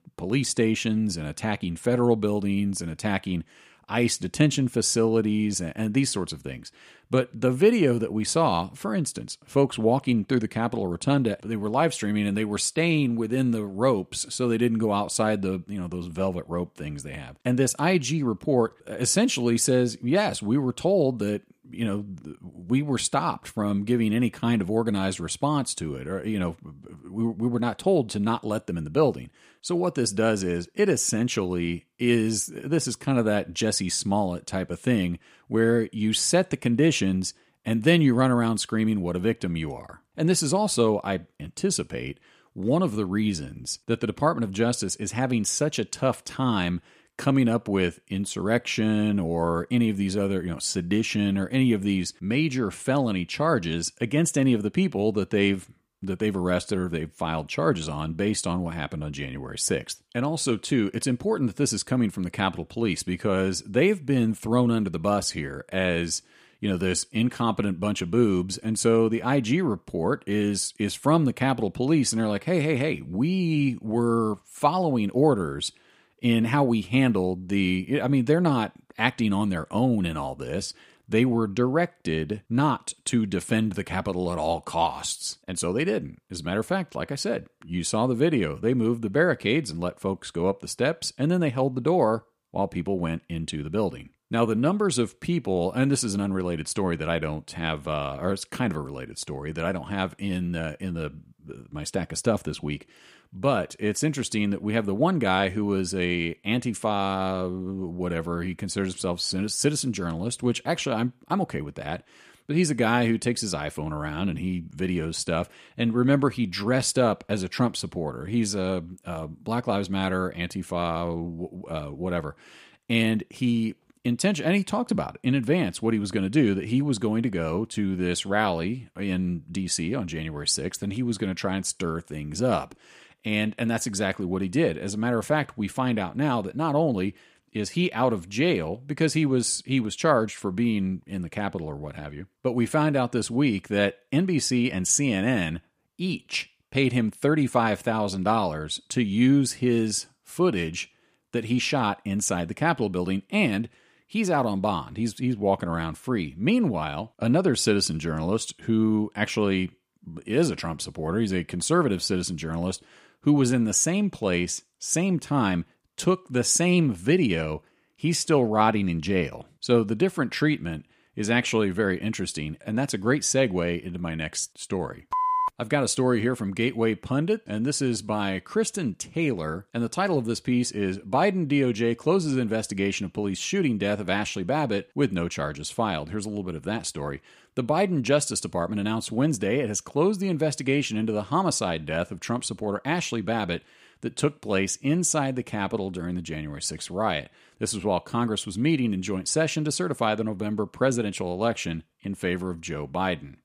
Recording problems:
none

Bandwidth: 15 kHz